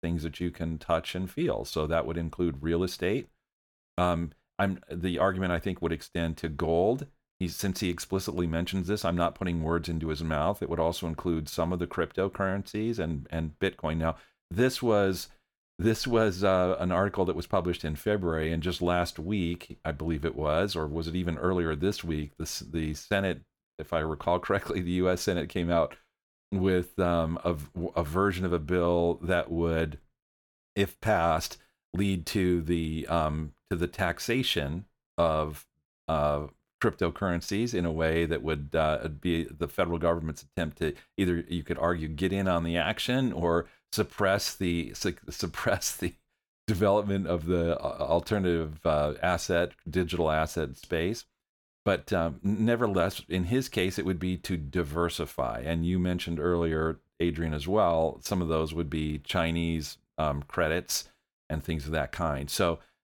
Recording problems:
none

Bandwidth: 18.5 kHz